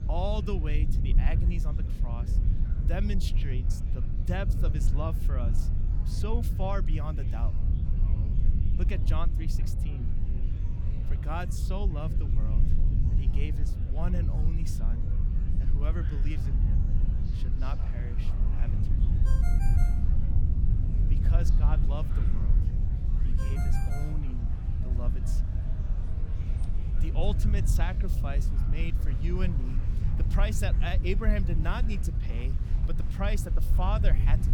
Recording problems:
low rumble; loud; throughout; 6 dB below the speech
murmuring crowd; noticeable; throughout; 15 dB below the speech
phone ringing; noticeable; from 19 to 24 s; peak 6 dB below the speech

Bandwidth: 18.5 kHz